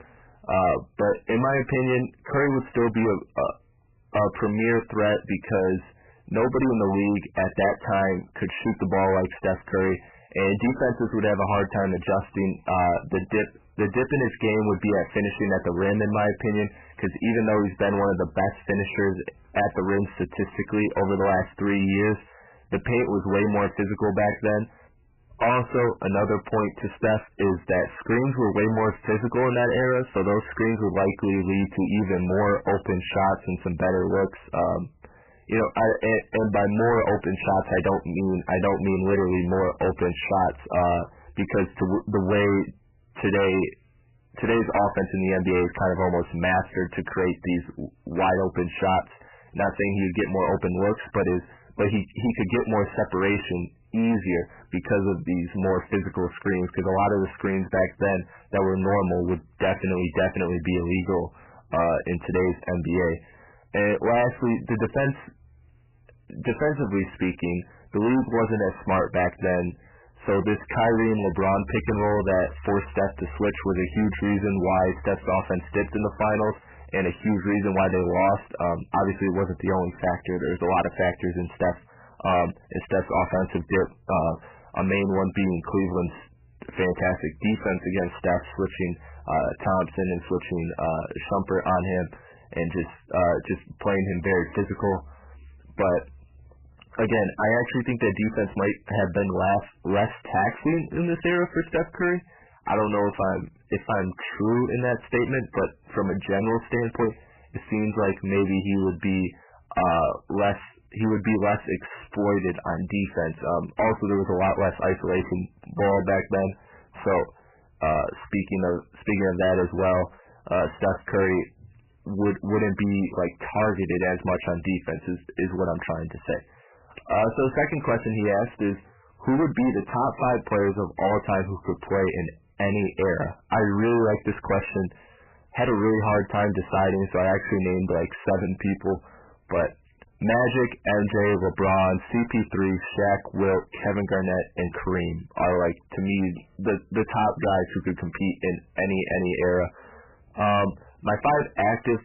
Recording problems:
distortion; heavy; 17% of the sound clipped
garbled, watery; badly; nothing above 3 kHz

